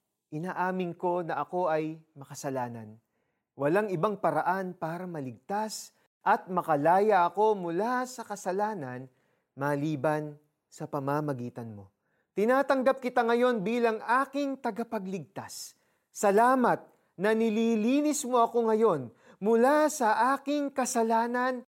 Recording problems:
none

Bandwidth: 16 kHz